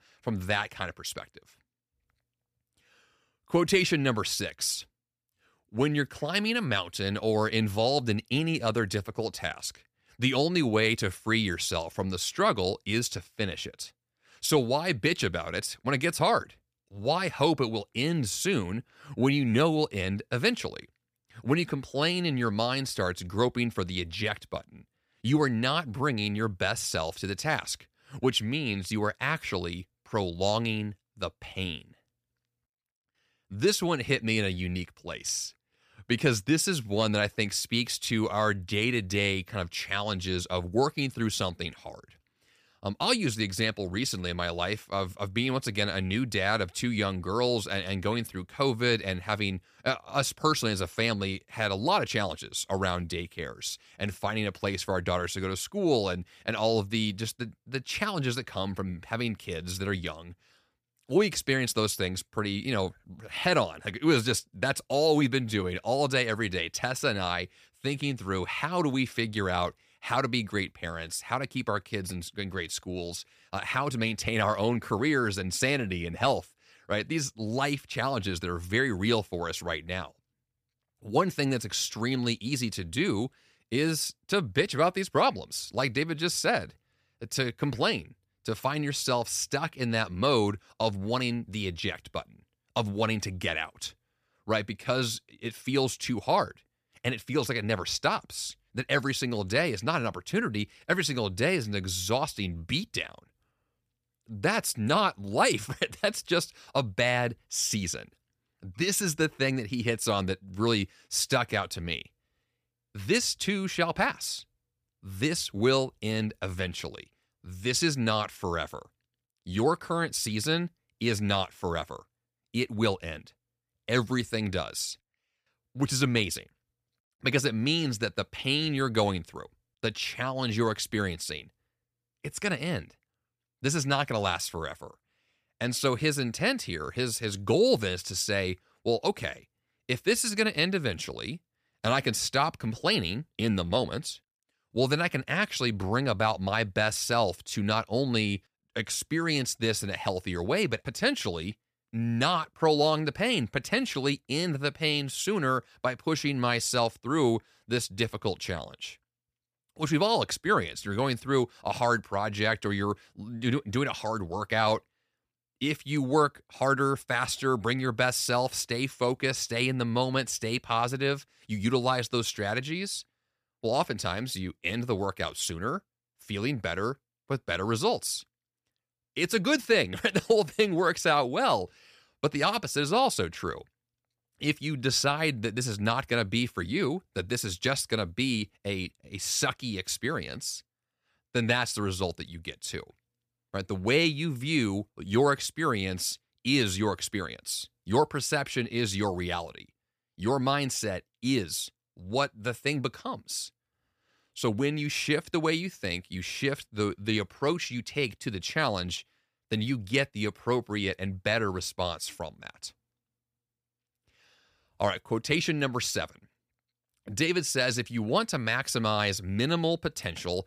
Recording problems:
none

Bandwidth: 15 kHz